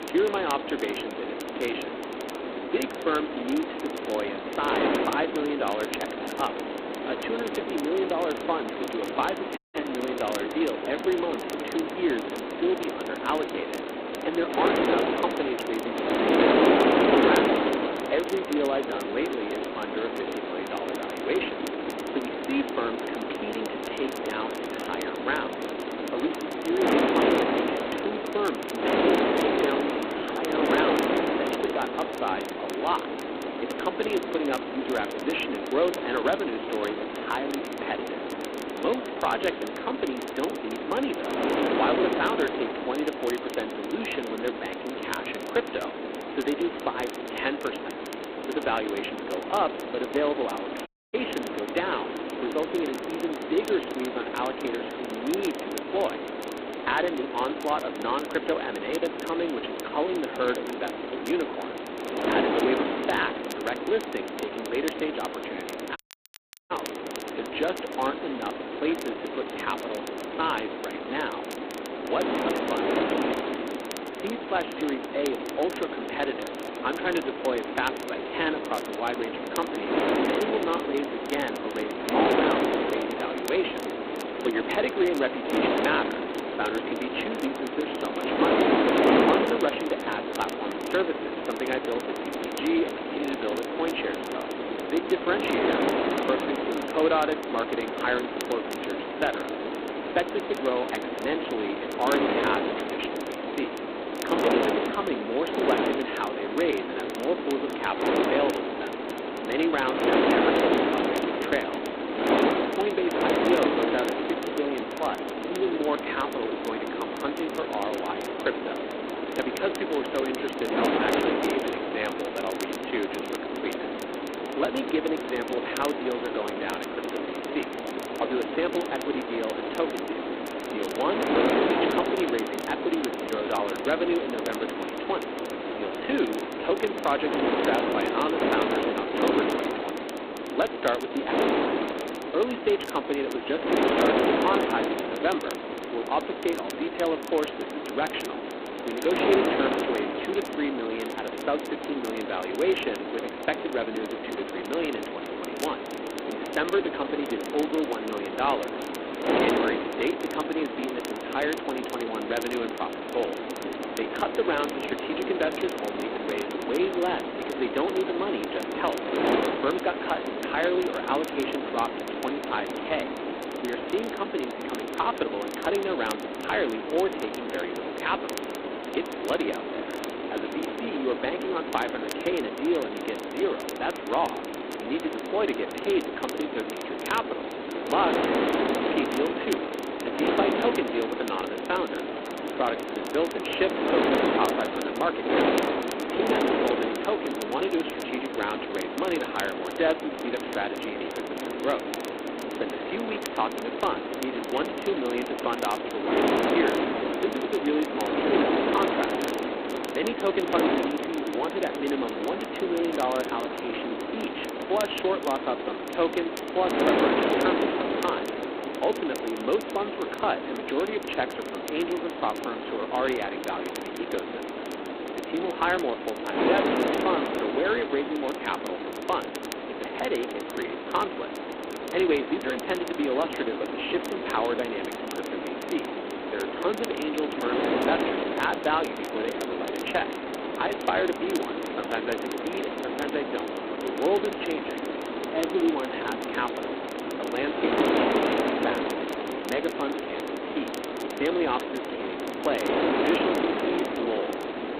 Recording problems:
phone-call audio; poor line; nothing above 4 kHz
wind noise on the microphone; heavy; as loud as the speech
crackle, like an old record; noticeable; 15 dB below the speech
audio cutting out; at 9.5 s, at 51 s and at 1:06 for 0.5 s

